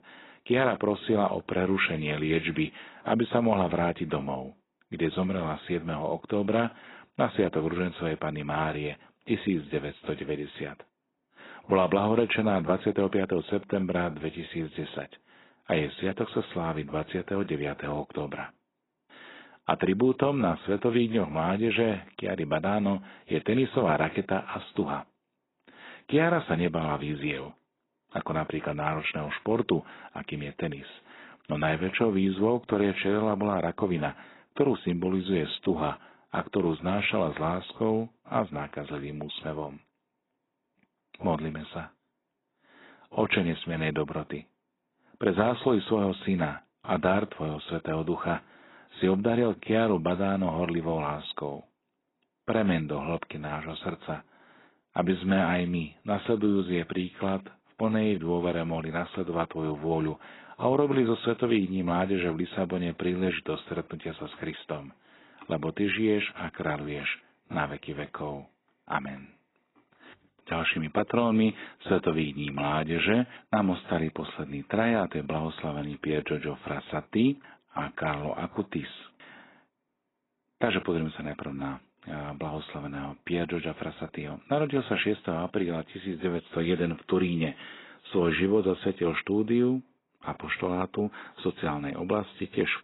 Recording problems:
garbled, watery; badly; nothing above 4 kHz

